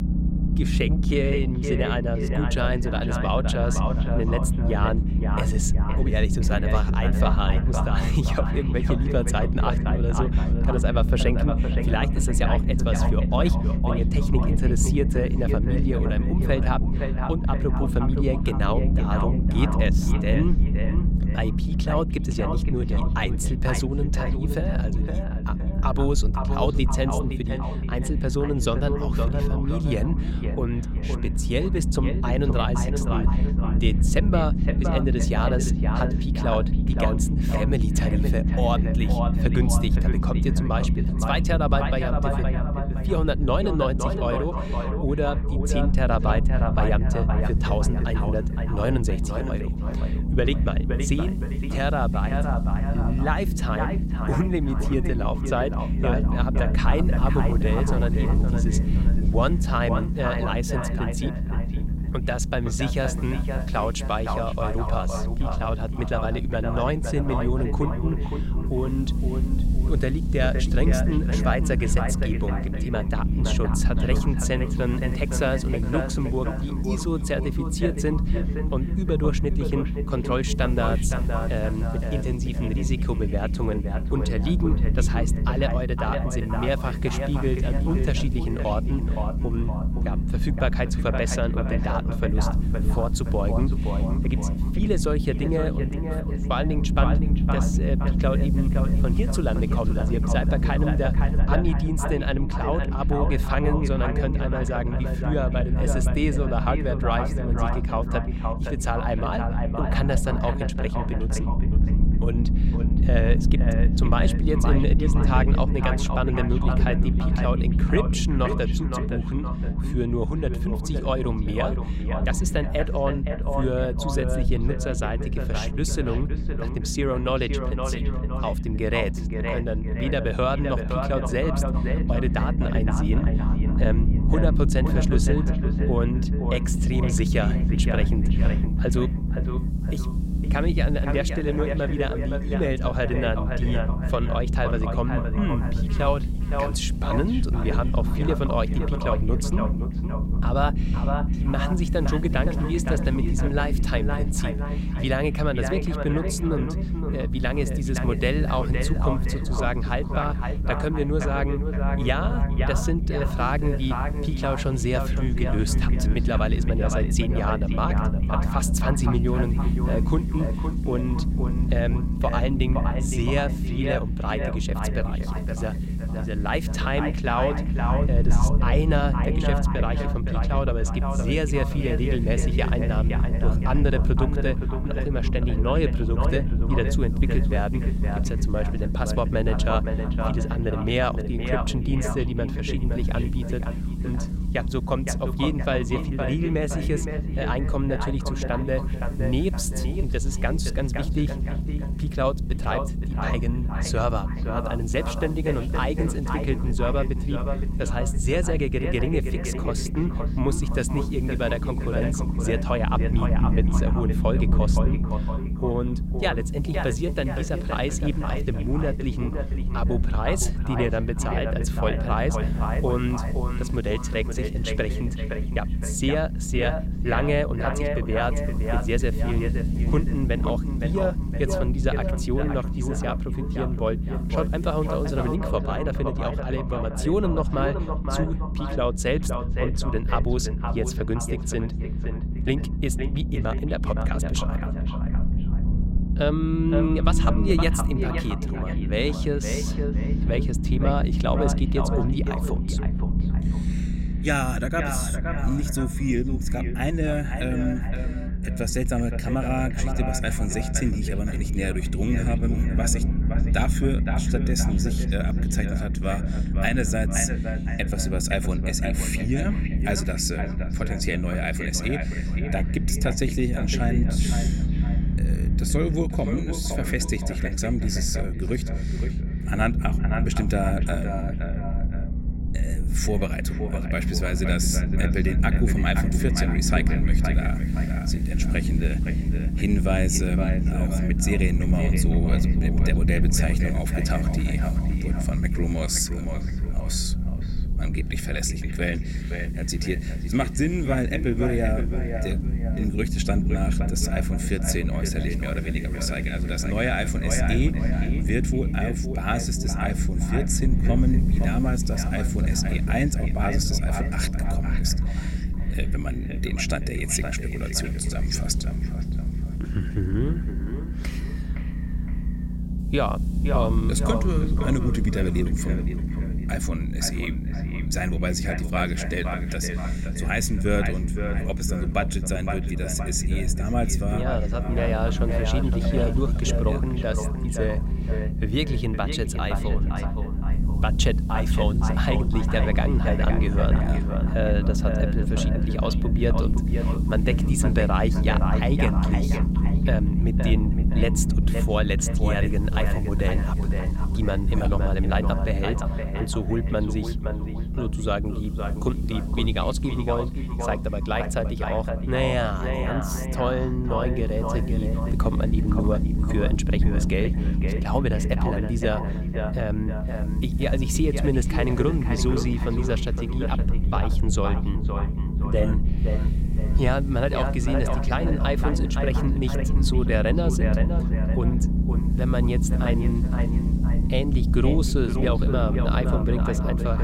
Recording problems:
echo of what is said; strong; throughout; 520 ms later, 7 dB below the speech
low rumble; loud; throughout; 8 dB below the speech
hiss; faint; from 47 s to 1:41, from 2:17 to 3:55 and from 4:46 on; 30 dB below the speech

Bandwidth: 16 kHz